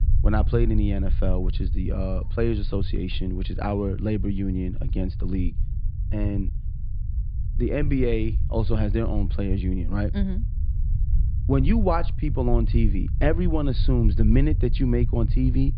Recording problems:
high frequencies cut off; severe; nothing above 4.5 kHz
low rumble; noticeable; throughout; 15 dB below the speech

